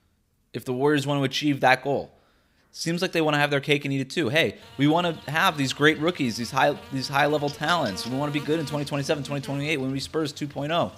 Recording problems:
electrical hum; noticeable; from 4.5 s on; 50 Hz, 20 dB below the speech

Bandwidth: 15.5 kHz